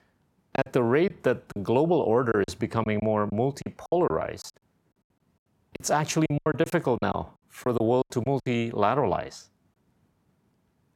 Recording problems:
choppy; very; 12% of the speech affected

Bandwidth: 16.5 kHz